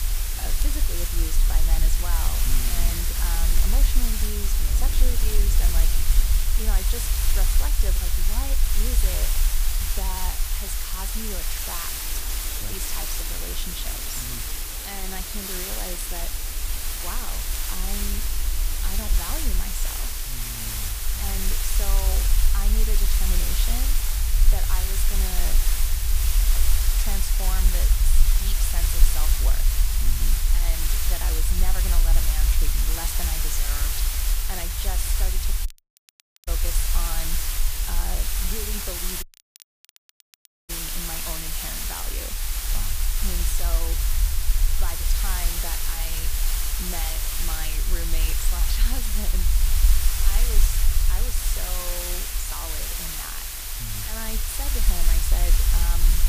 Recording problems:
hiss; very loud; throughout; 9 dB above the speech
rain or running water; loud; throughout; 9 dB below the speech
low rumble; noticeable; throughout; 10 dB below the speech
crackle, like an old record; very faint; 15 dB below the speech
audio cutting out; at 36 s for 1 s and at 39 s for 1.5 s

